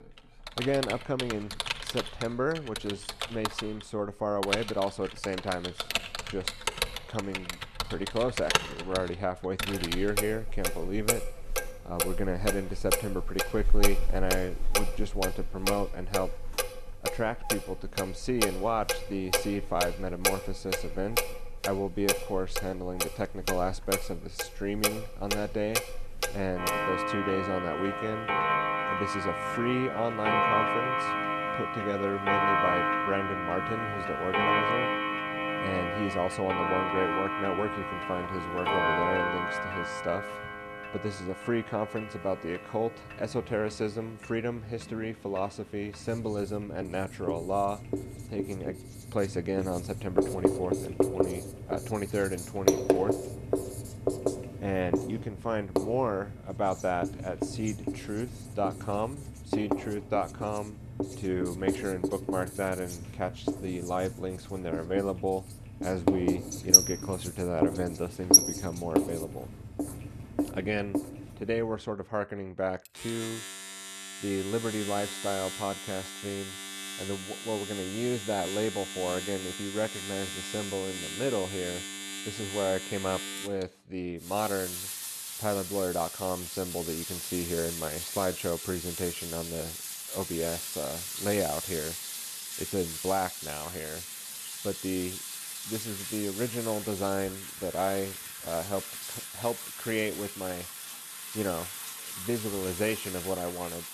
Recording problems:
household noises; very loud; throughout; 2 dB above the speech

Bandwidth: 13.5 kHz